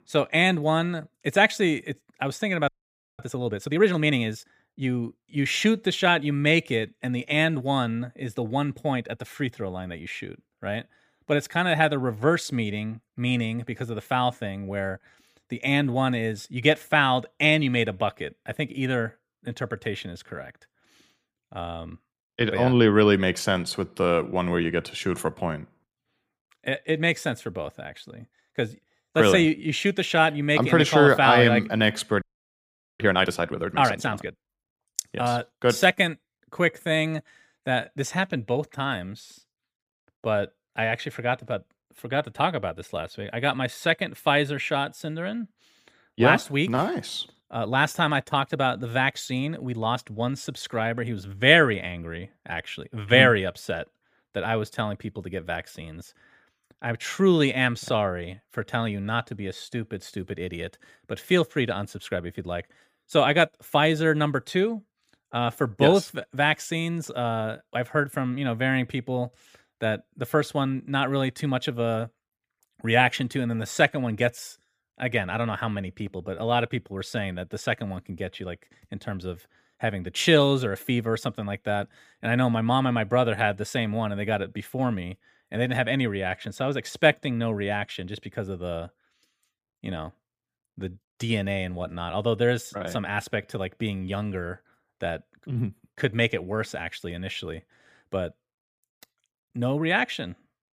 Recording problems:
audio freezing; at 2.5 s for 0.5 s and at 32 s for 1 s

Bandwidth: 15 kHz